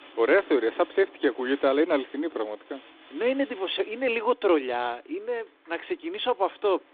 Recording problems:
phone-call audio
wind in the background; faint; throughout; 25 dB below the speech

